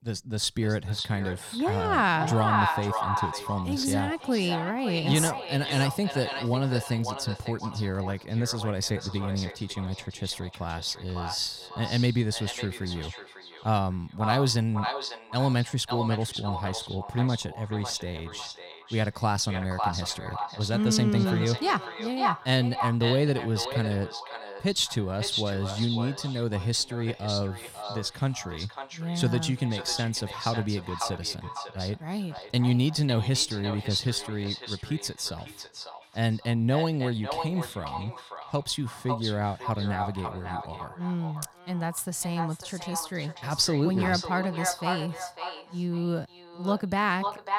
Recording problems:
echo of what is said; strong; throughout; 550 ms later, 7 dB below the speech

